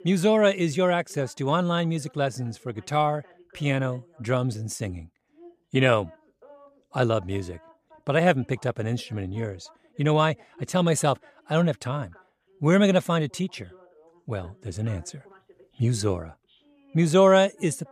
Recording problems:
voice in the background; faint; throughout; 30 dB below the speech

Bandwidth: 14.5 kHz